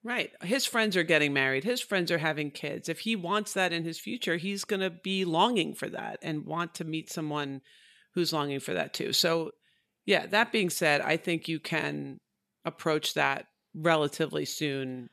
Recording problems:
none

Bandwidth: 14 kHz